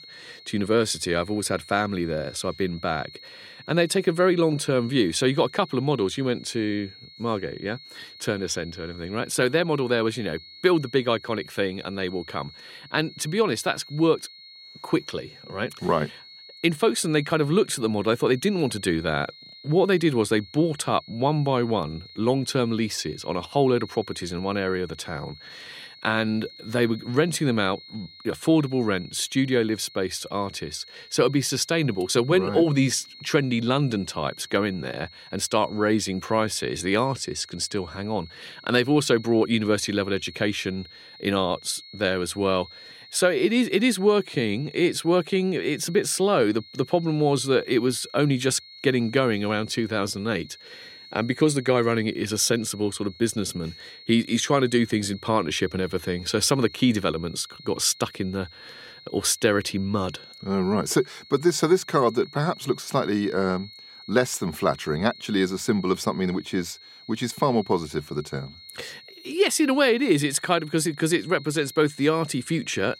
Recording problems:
high-pitched whine; noticeable; throughout; 4.5 kHz, 20 dB below the speech

